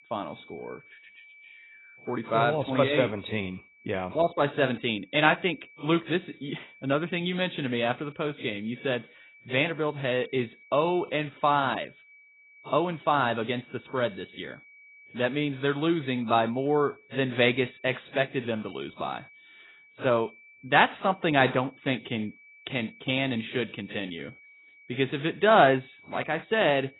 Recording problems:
garbled, watery; badly; nothing above 4 kHz
high-pitched whine; faint; throughout; 2.5 kHz, 25 dB below the speech

